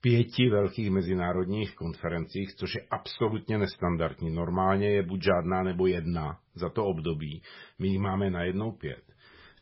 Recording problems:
garbled, watery; badly; nothing above 5.5 kHz

